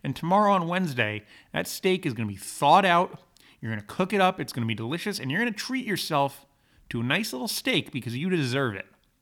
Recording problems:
none

